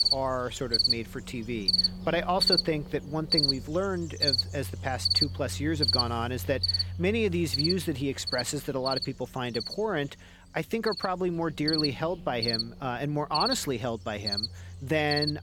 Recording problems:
animal sounds; very loud; throughout; 3 dB above the speech

